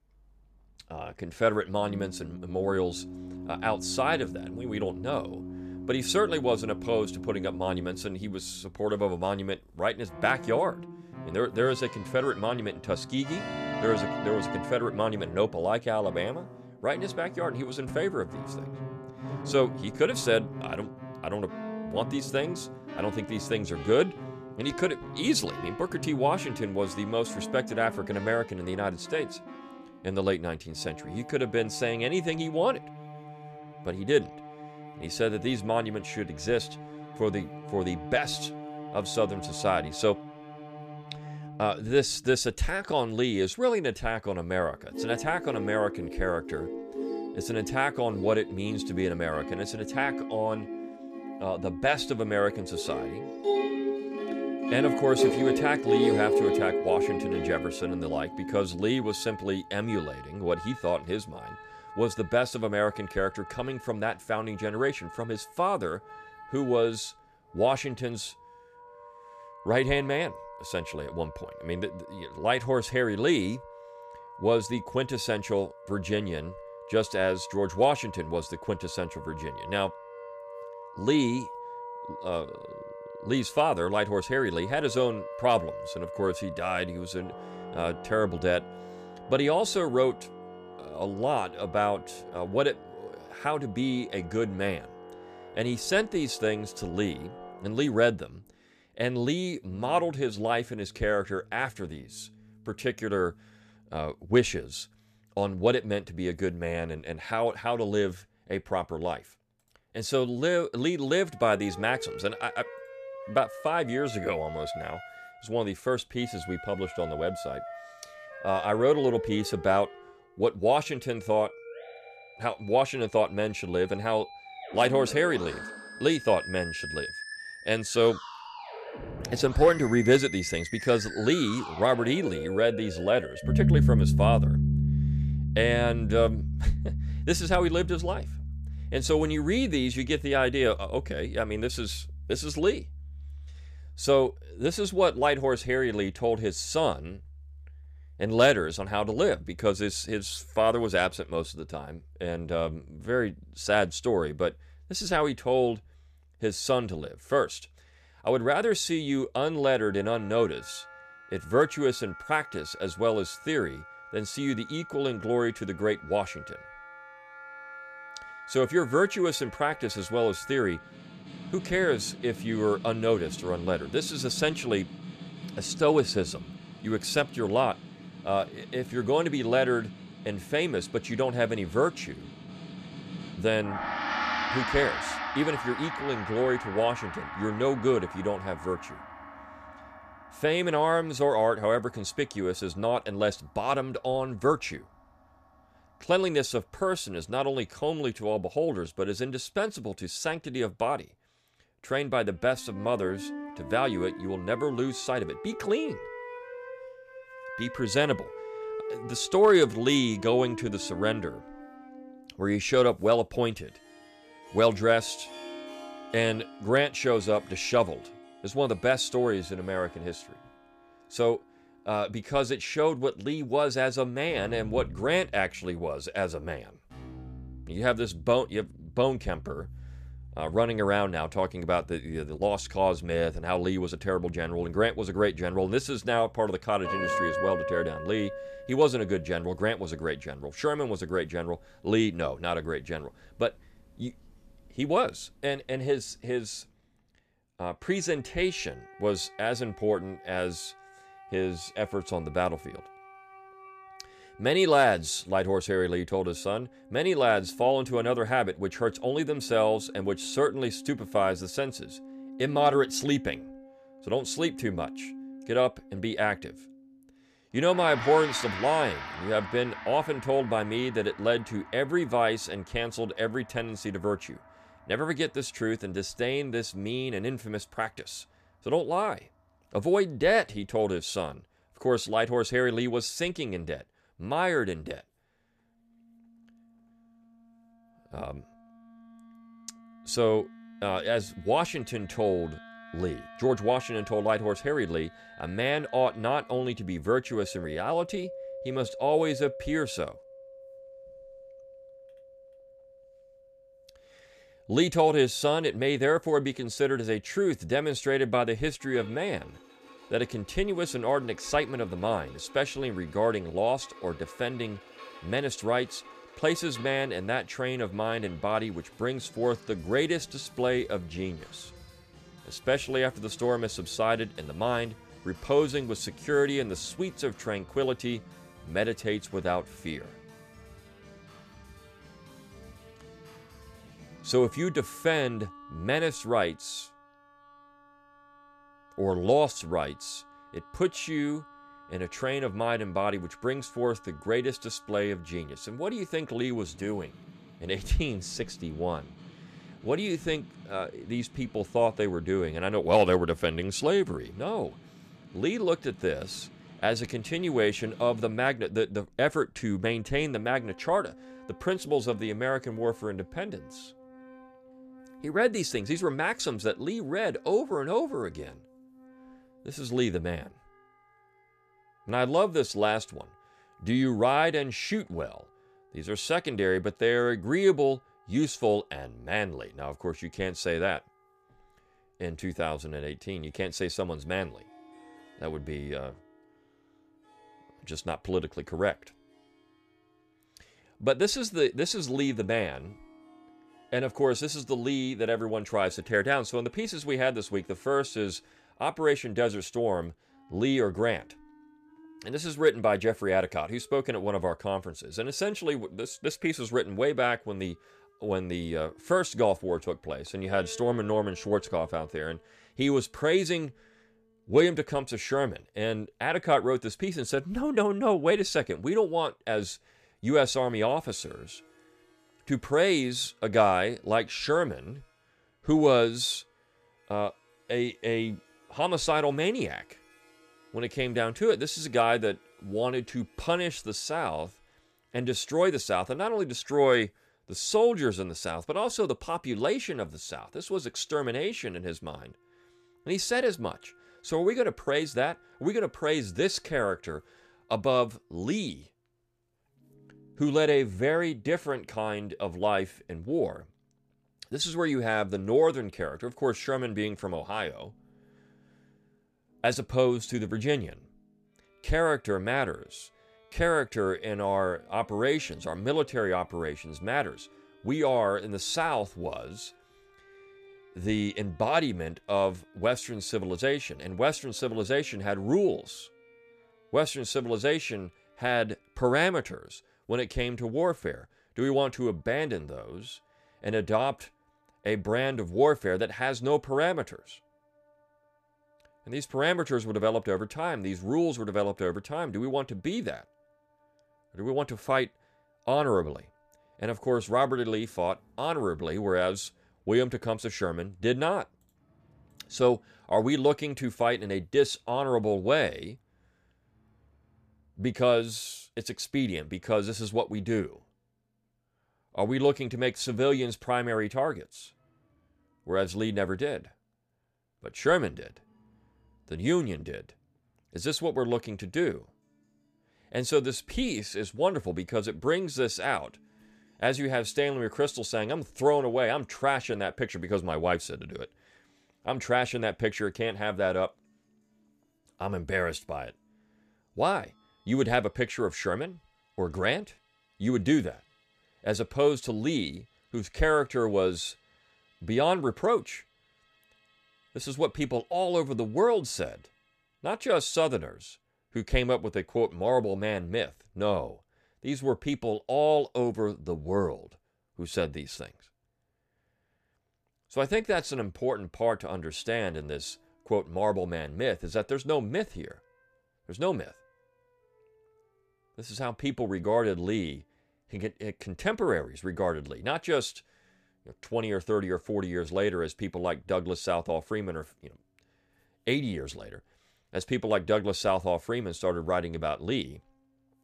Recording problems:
background music; loud; throughout; 10 dB below the speech

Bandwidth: 14.5 kHz